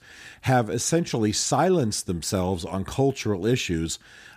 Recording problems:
none

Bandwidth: 14.5 kHz